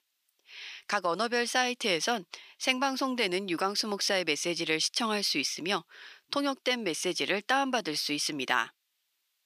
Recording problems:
thin; somewhat; fading below 850 Hz

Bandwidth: 15 kHz